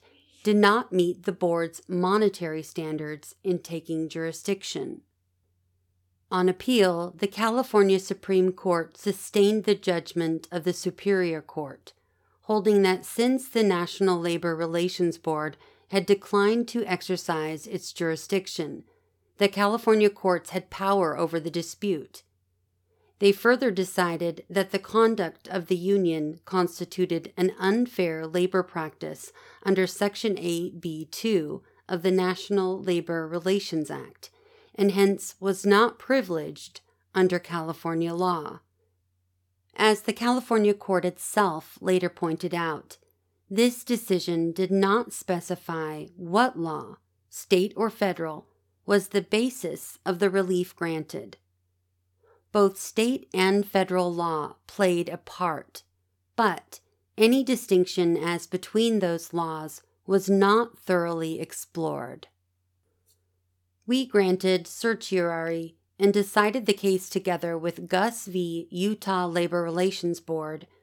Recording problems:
none

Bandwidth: 18 kHz